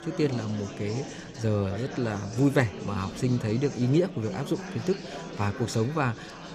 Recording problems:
chatter from many people; noticeable; throughout; 10 dB below the speech

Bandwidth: 14.5 kHz